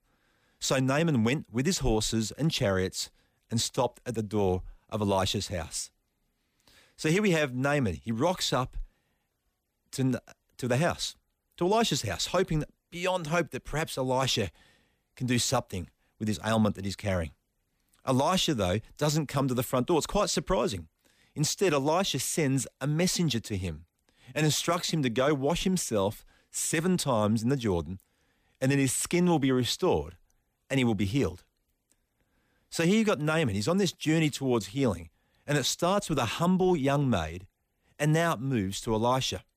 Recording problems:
none

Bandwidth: 15 kHz